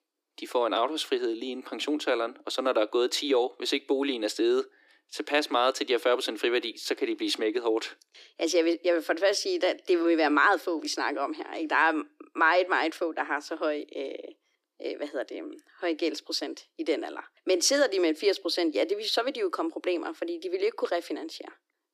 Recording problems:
thin; very; fading below 300 Hz

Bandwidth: 15 kHz